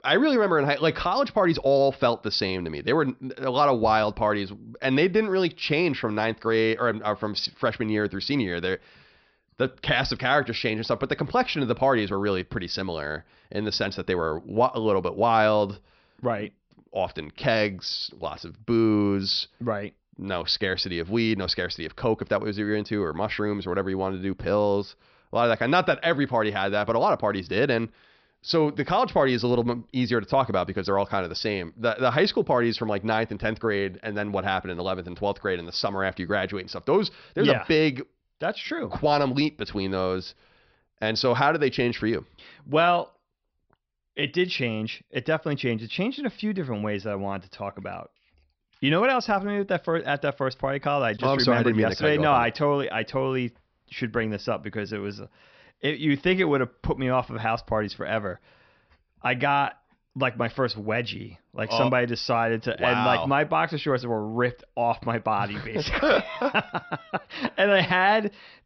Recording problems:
high frequencies cut off; noticeable; nothing above 5.5 kHz

